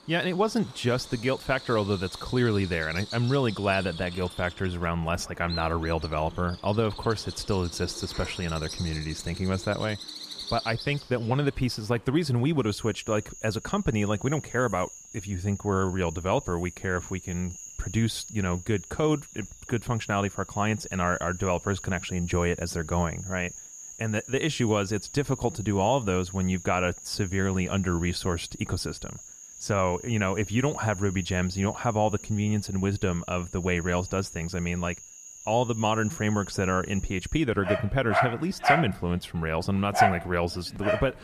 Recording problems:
animal sounds; loud; throughout; 9 dB below the speech

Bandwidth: 14.5 kHz